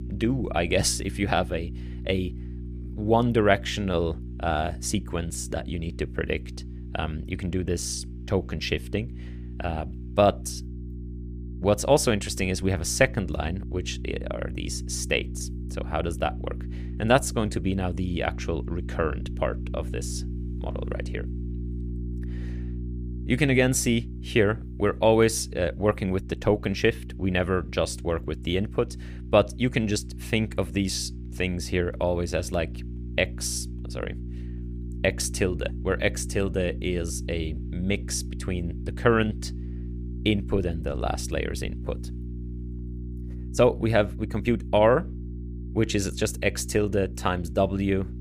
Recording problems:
electrical hum; noticeable; throughout; 60 Hz, 20 dB below the speech

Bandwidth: 15 kHz